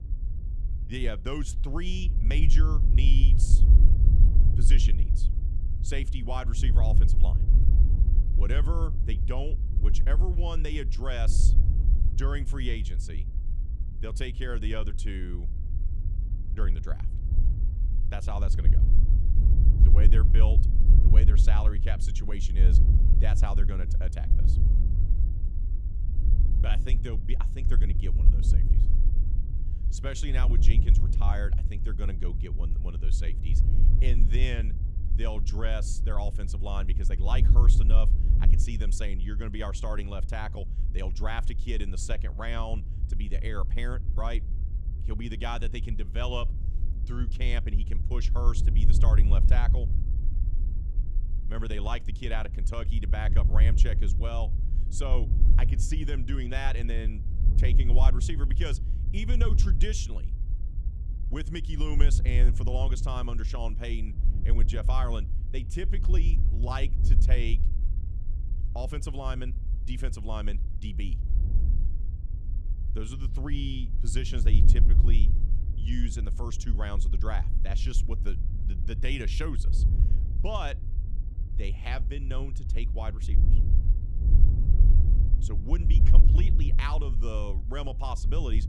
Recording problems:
wind noise on the microphone; heavy; 8 dB below the speech

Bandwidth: 14.5 kHz